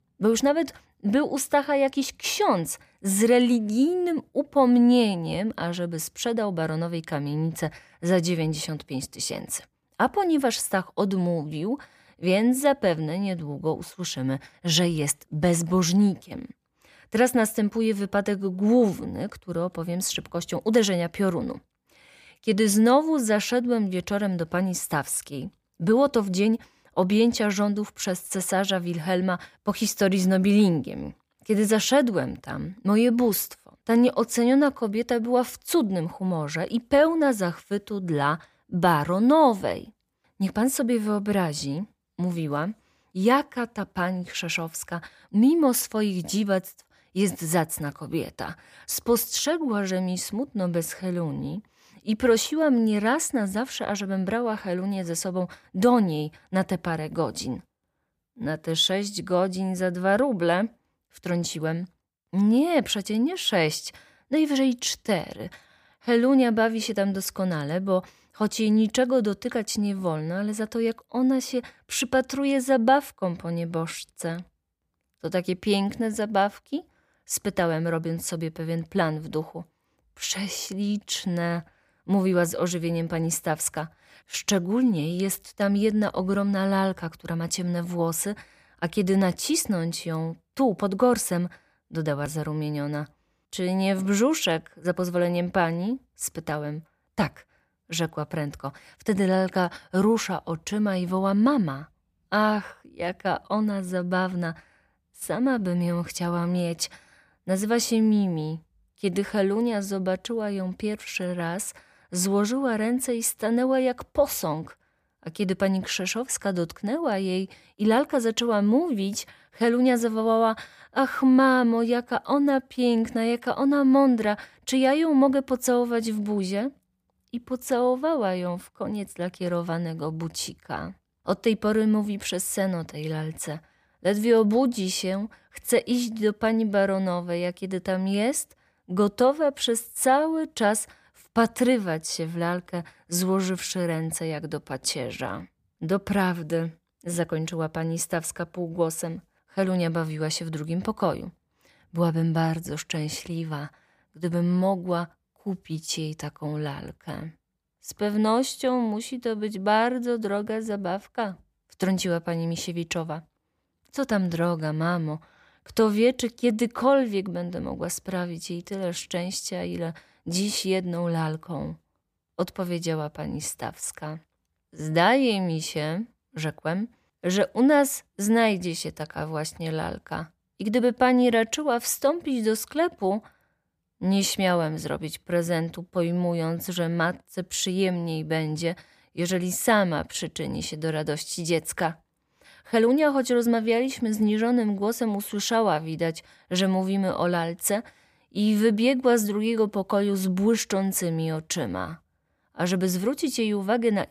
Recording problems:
none

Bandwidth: 15 kHz